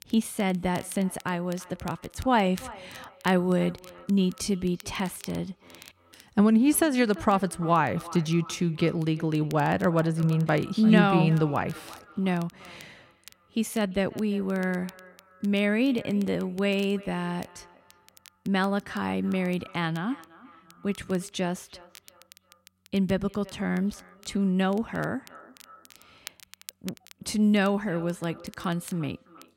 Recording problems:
echo of what is said; faint; throughout; 340 ms later, 20 dB below the speech
crackle, like an old record; faint; 25 dB below the speech

